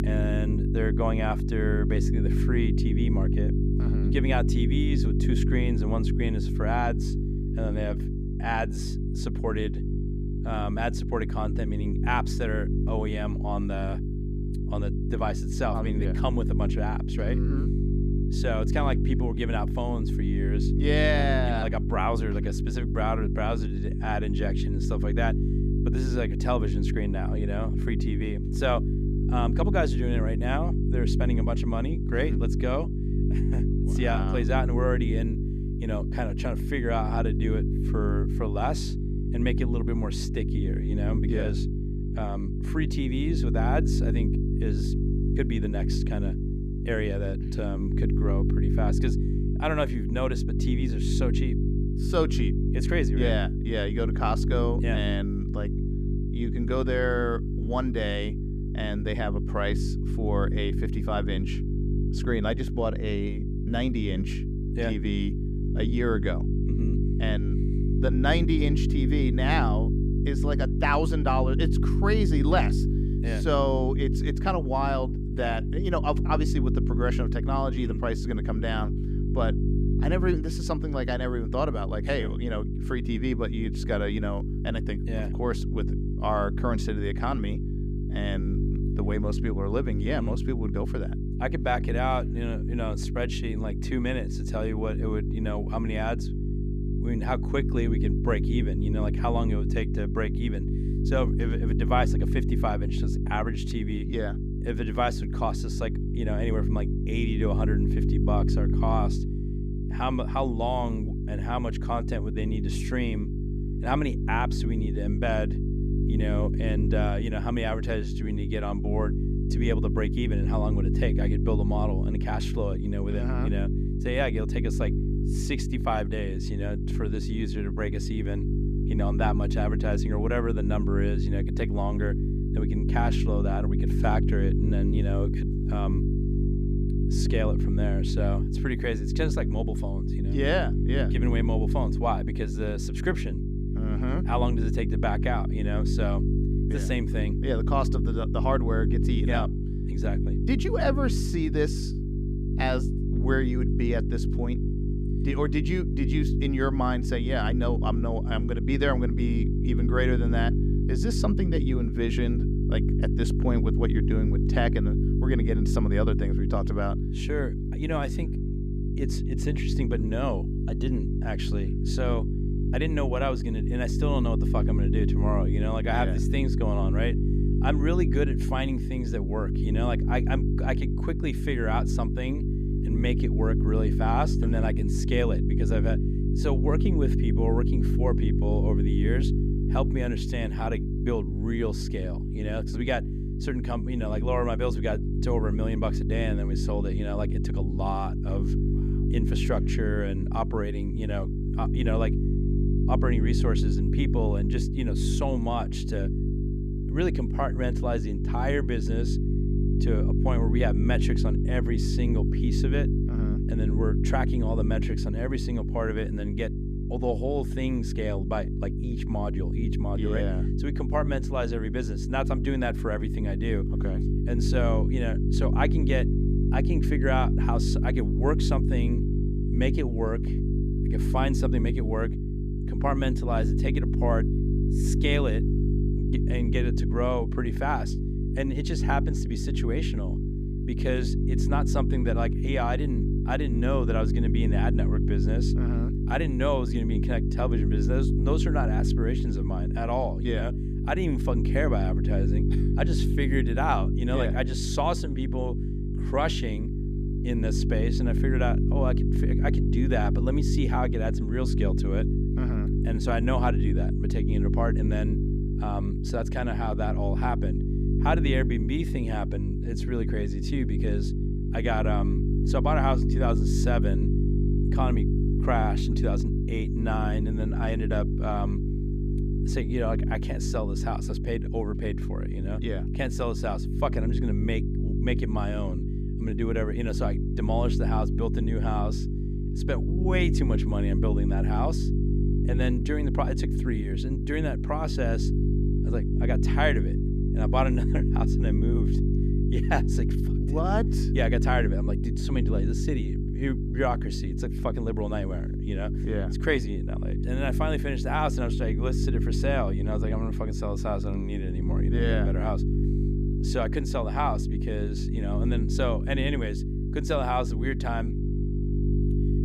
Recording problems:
electrical hum; loud; throughout; 50 Hz, 5 dB below the speech

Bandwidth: 14.5 kHz